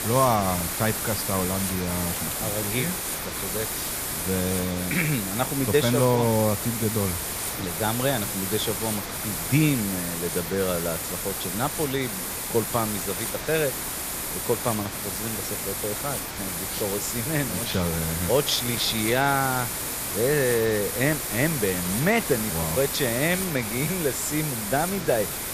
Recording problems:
hiss; loud; throughout; 2 dB below the speech

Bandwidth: 14.5 kHz